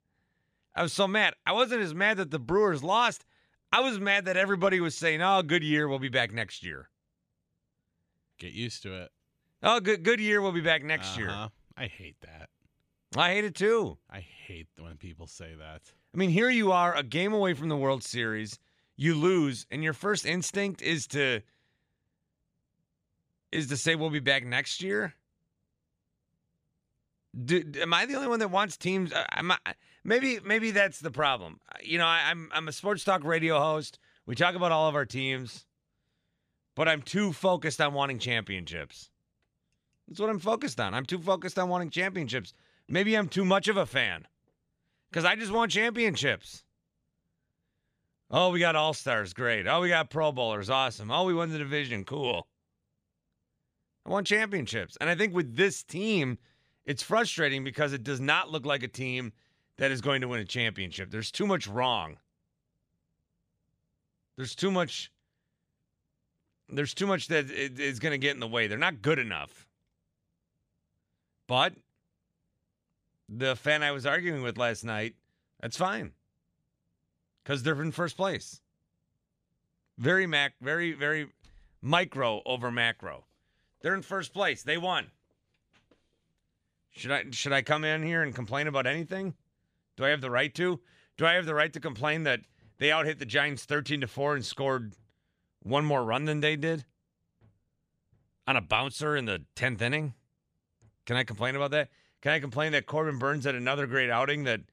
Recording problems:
none

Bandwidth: 15 kHz